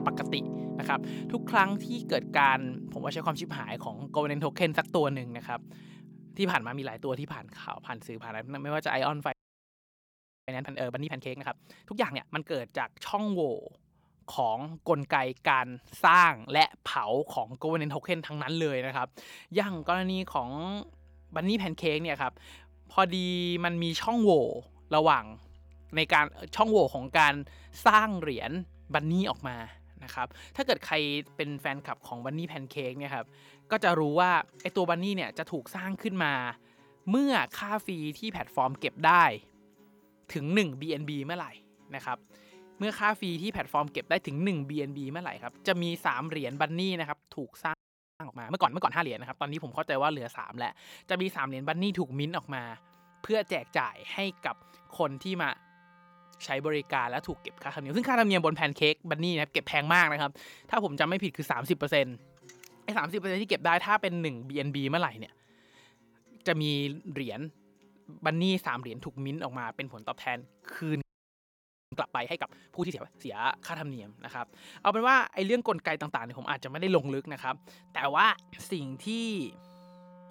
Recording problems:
background music; noticeable; throughout; 20 dB below the speech
audio freezing; at 9.5 s for 1 s, at 48 s and at 1:11 for 1 s

